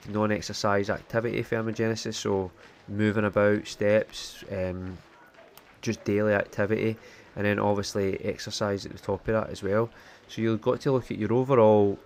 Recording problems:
murmuring crowd; faint; throughout; 25 dB below the speech

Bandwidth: 15.5 kHz